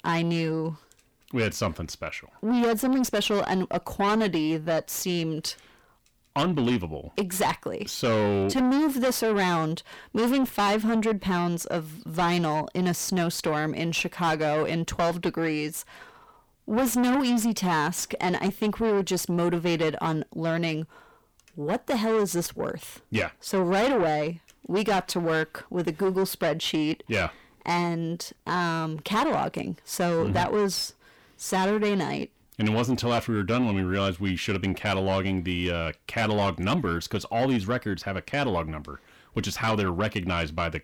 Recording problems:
distortion; heavy; 7 dB below the speech

